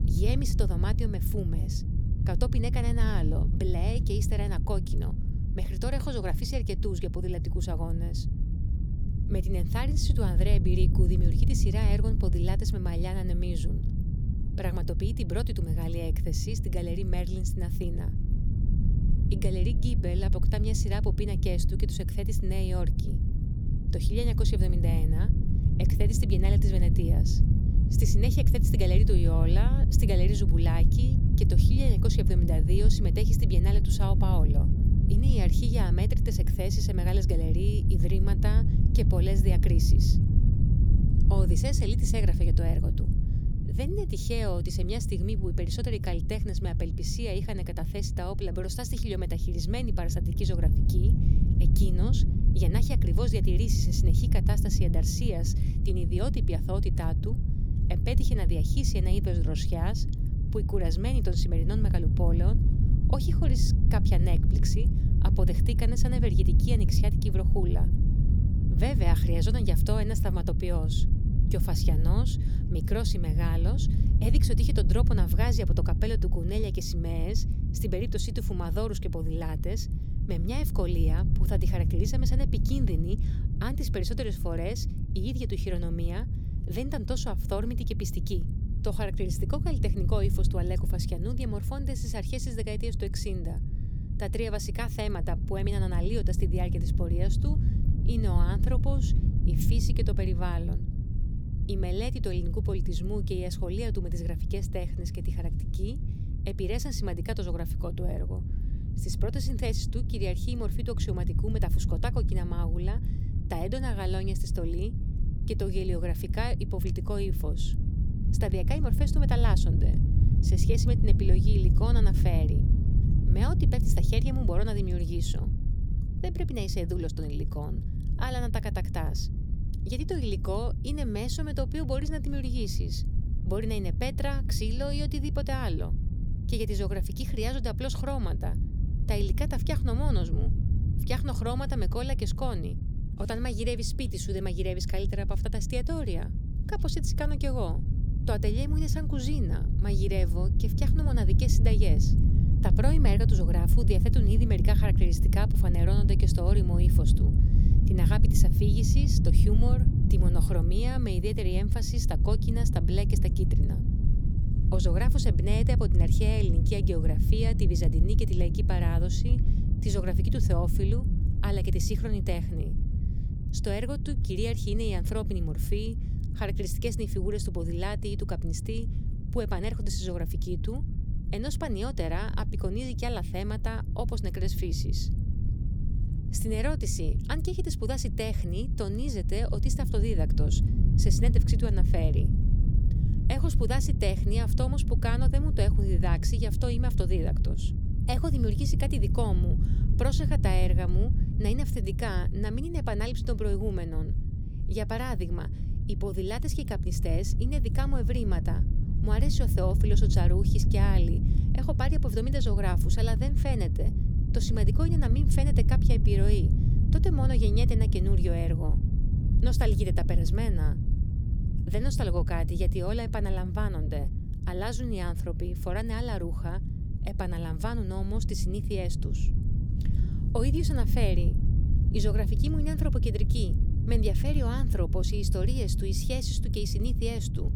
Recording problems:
low rumble; loud; throughout; 5 dB below the speech

